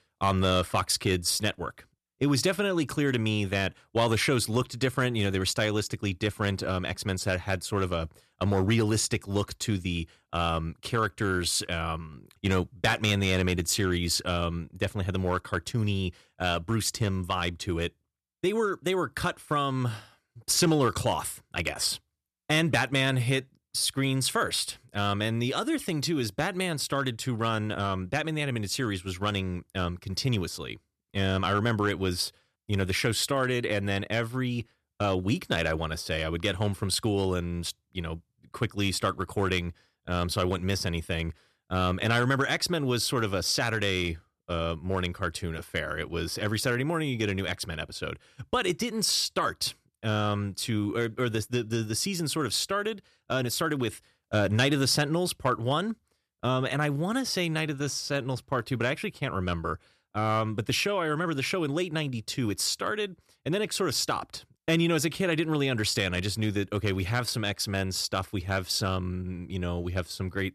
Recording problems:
none

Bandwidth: 13.5 kHz